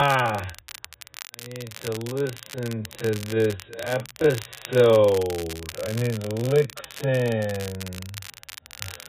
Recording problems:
garbled, watery; badly; nothing above 4 kHz
wrong speed, natural pitch; too slow; 0.5 times normal speed
crackle, like an old record; noticeable; 15 dB below the speech
abrupt cut into speech; at the start

